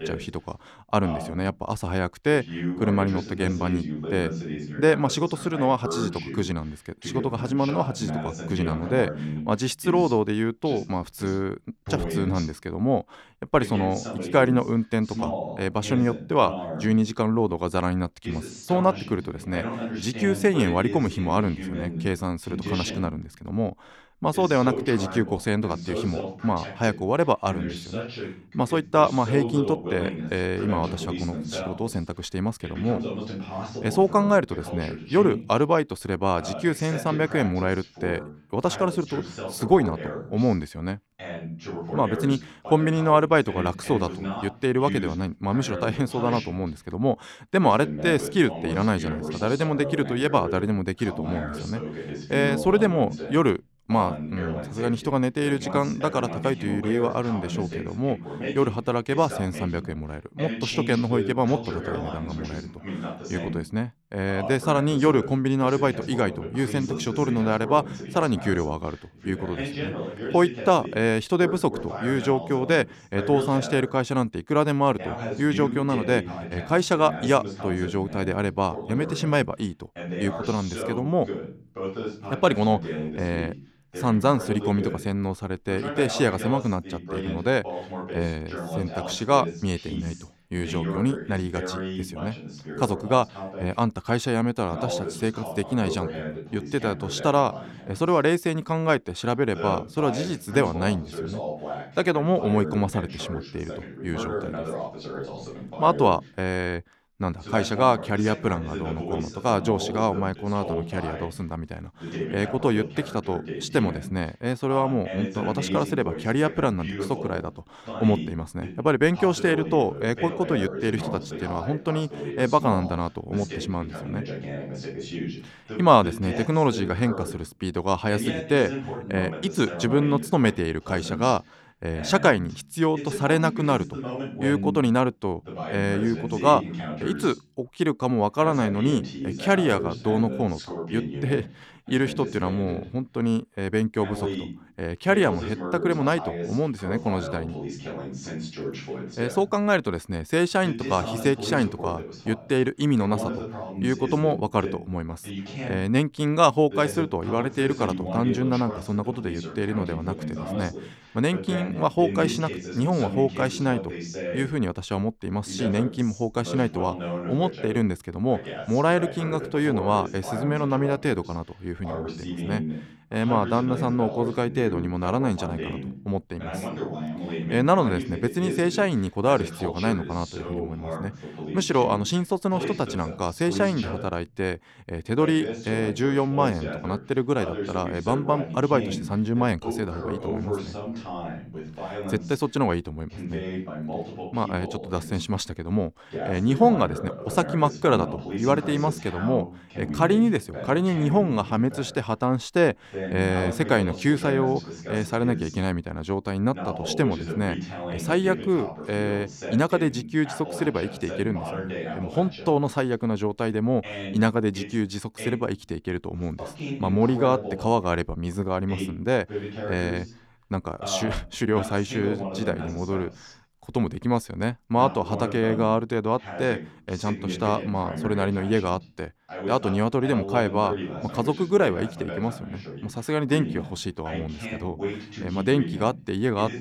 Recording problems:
voice in the background; loud; throughout; 9 dB below the speech

